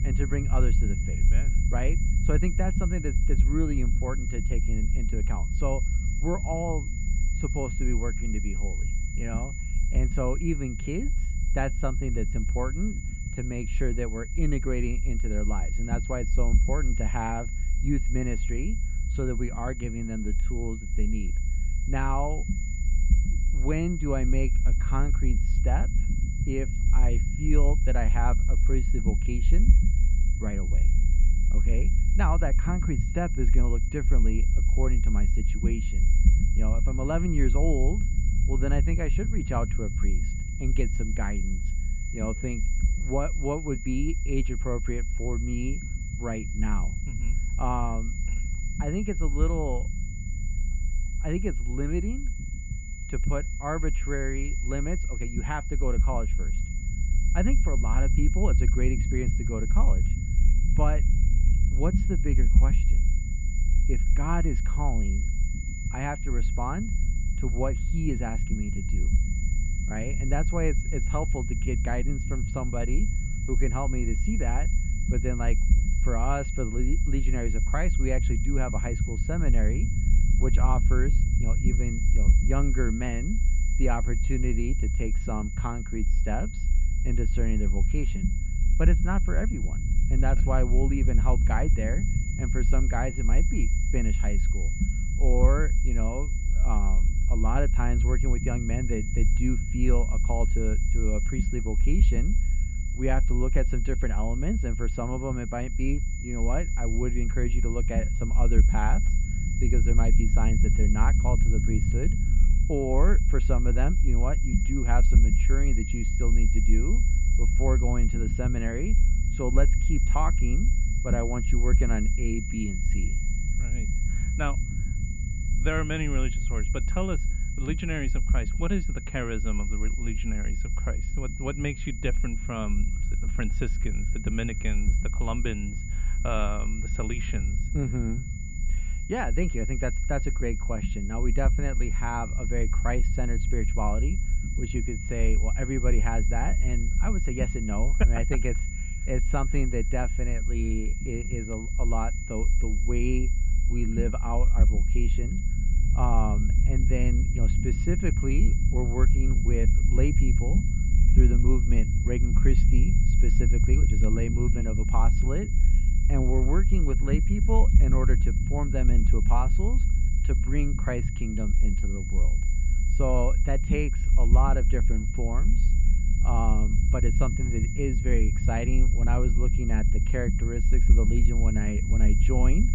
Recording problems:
muffled; very; fading above 2.5 kHz
high-pitched whine; loud; throughout; 2 kHz, 9 dB below the speech
low rumble; noticeable; throughout; 10 dB below the speech

